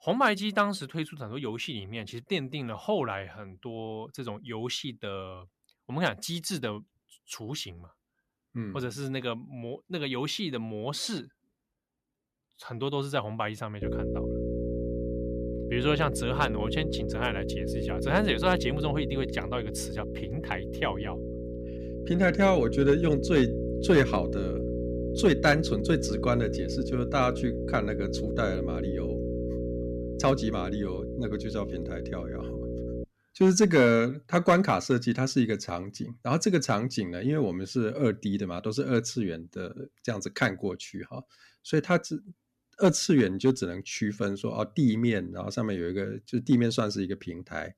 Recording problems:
electrical hum; loud; from 14 to 33 s; 60 Hz, 7 dB below the speech

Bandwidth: 14.5 kHz